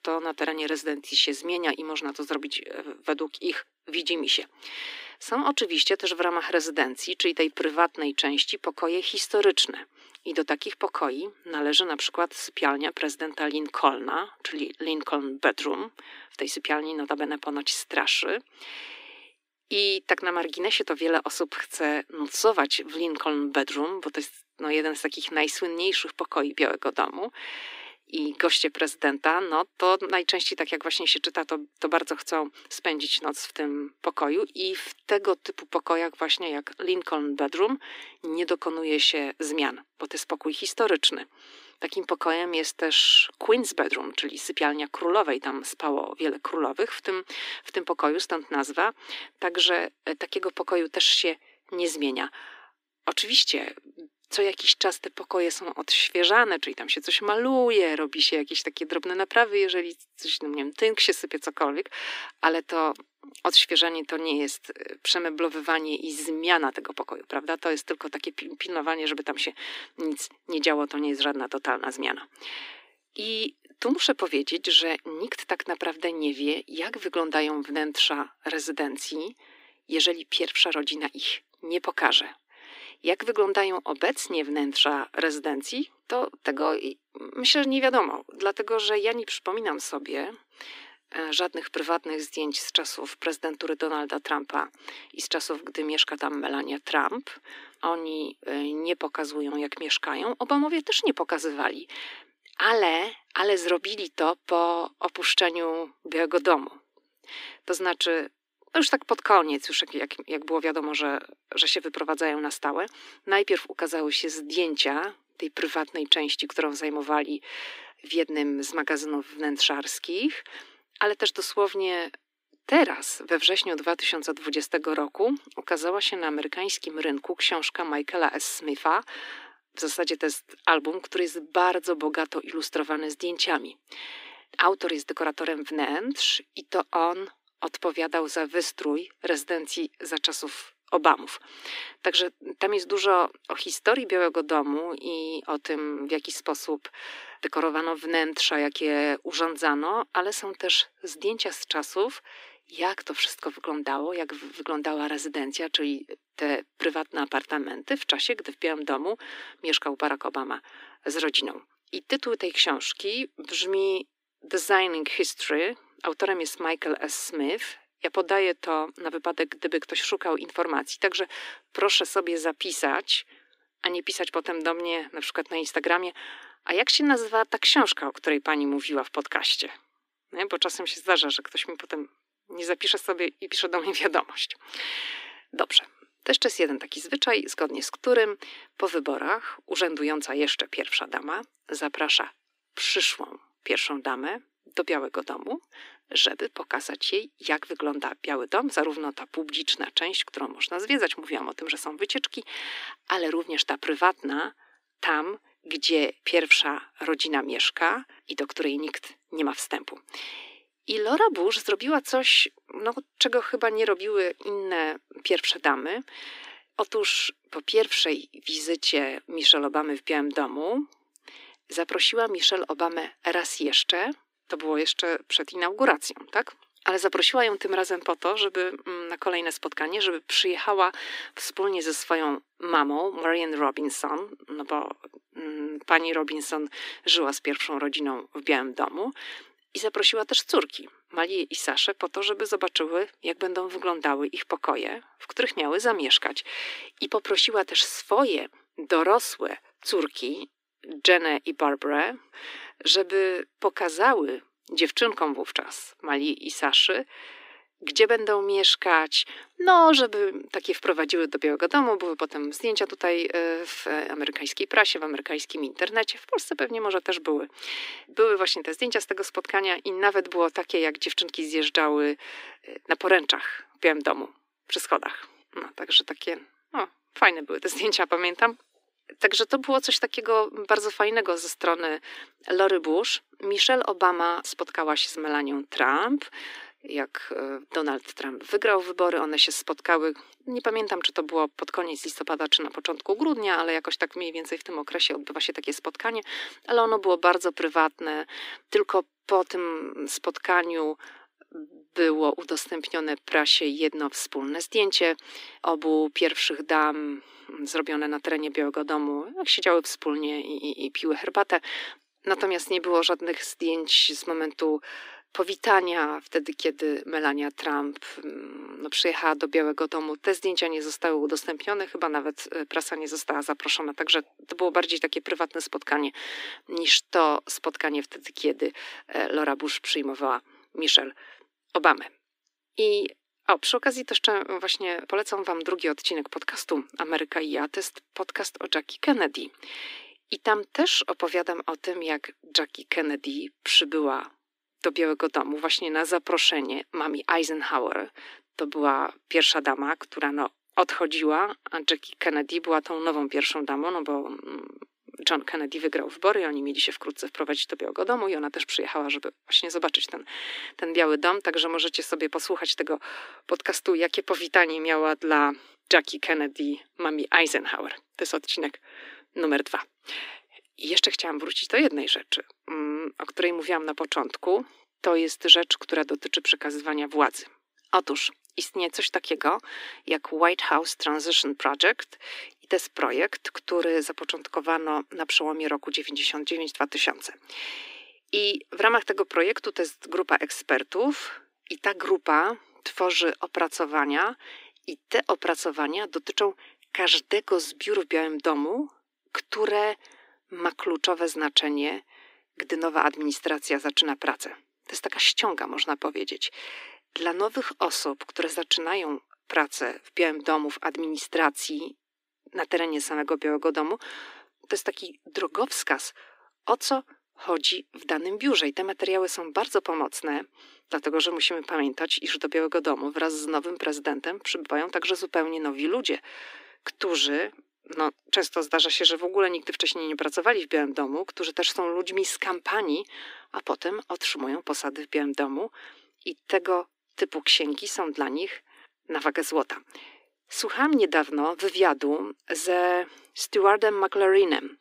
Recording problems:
thin; very; fading below 300 Hz

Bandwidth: 15.5 kHz